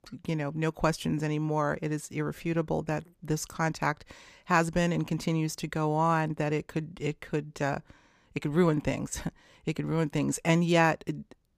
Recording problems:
none

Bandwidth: 15 kHz